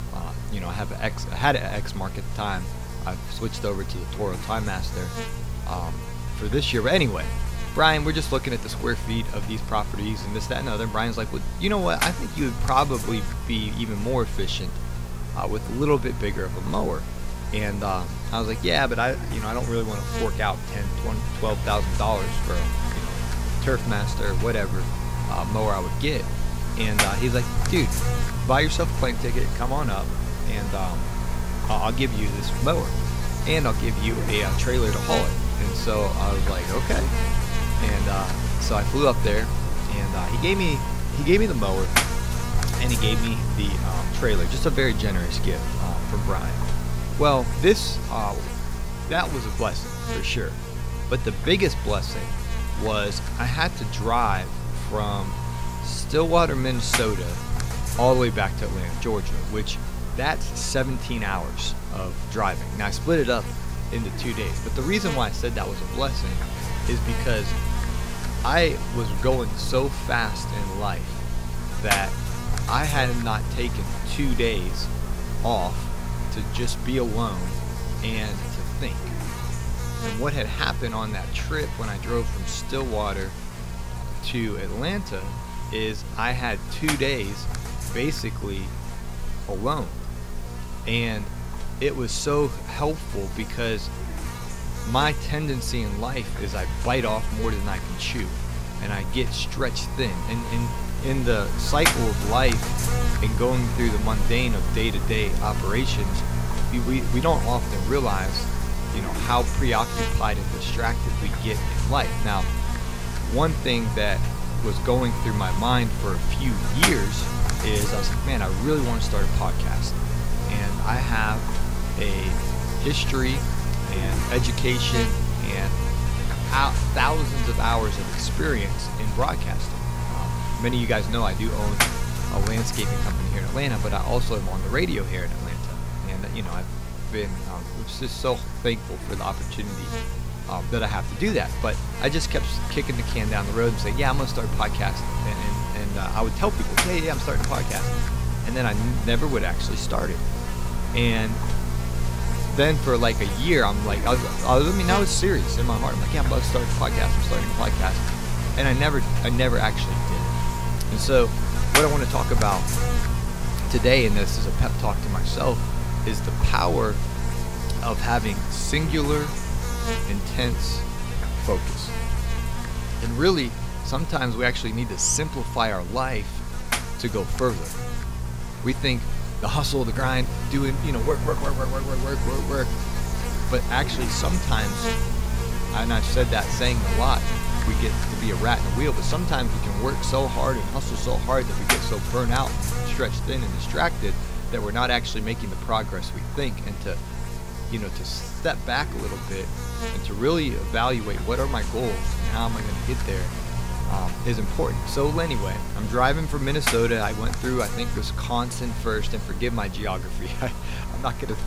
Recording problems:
electrical hum; loud; throughout; 60 Hz, 6 dB below the speech

